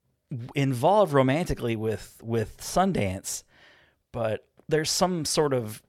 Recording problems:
none

